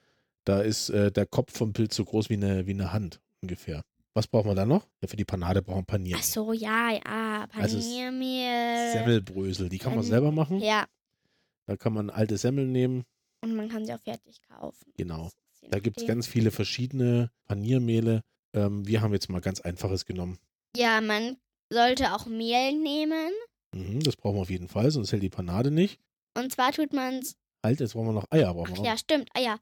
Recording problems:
none

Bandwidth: 18.5 kHz